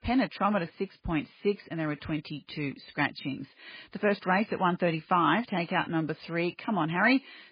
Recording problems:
garbled, watery; badly; nothing above 4.5 kHz

